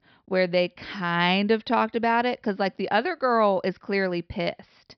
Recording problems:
high frequencies cut off; noticeable; nothing above 5.5 kHz

